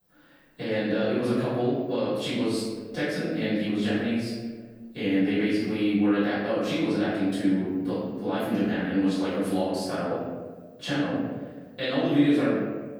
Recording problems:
room echo; strong; dies away in 1.3 s
off-mic speech; far

